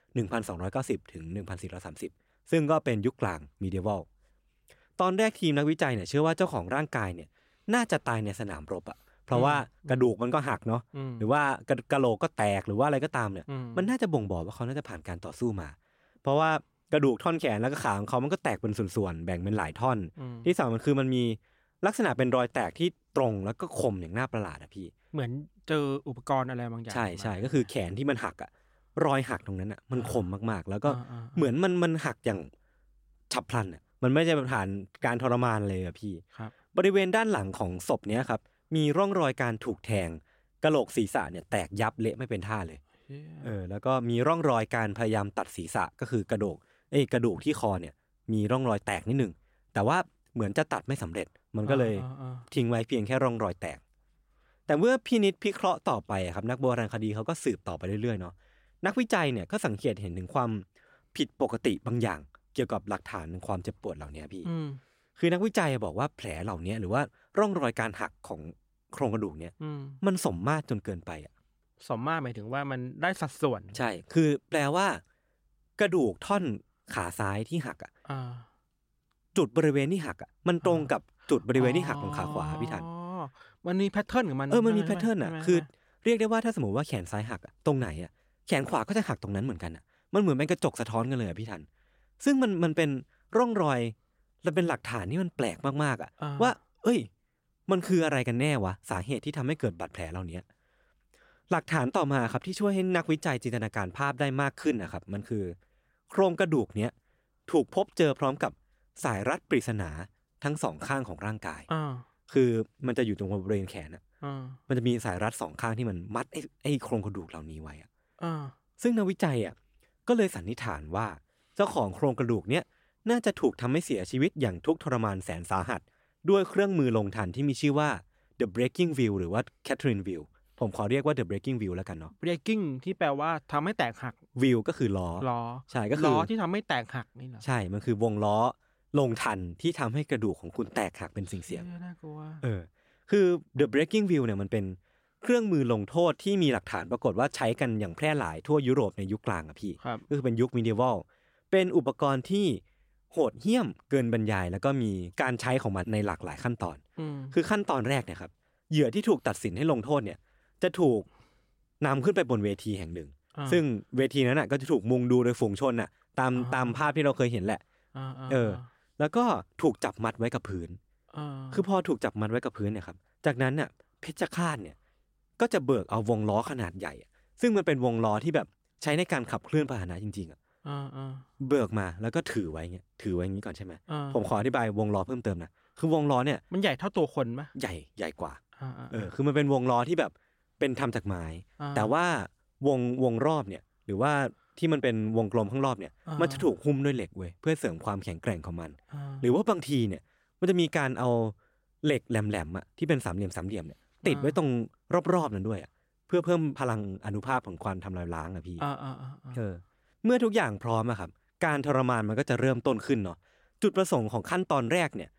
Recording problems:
none

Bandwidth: 16 kHz